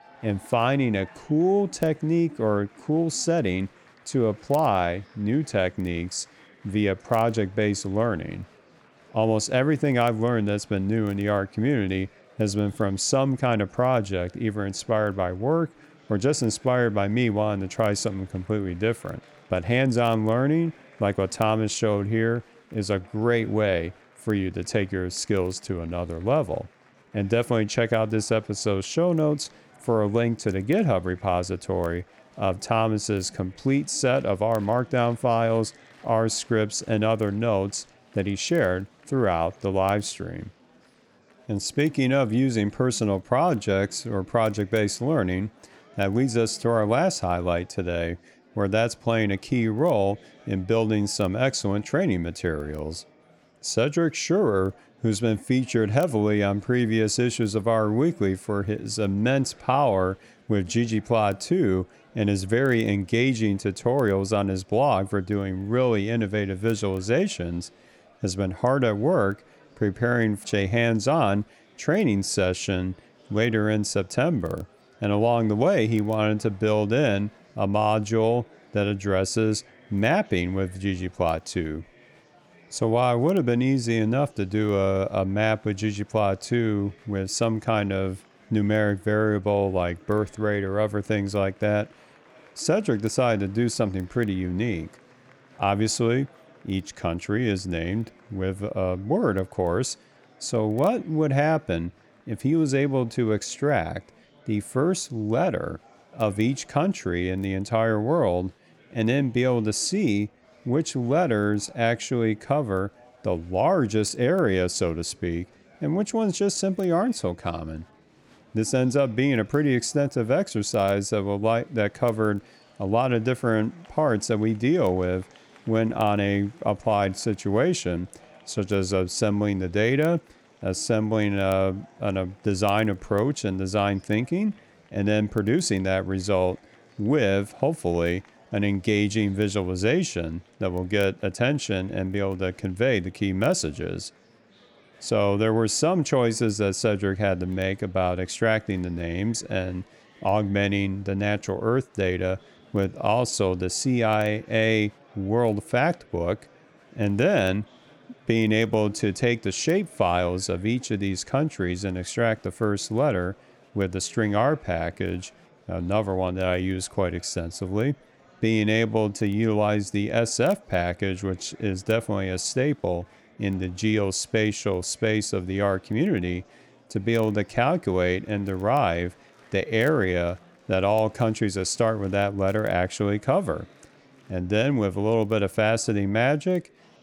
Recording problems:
murmuring crowd; faint; throughout; 30 dB below the speech

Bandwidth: 18.5 kHz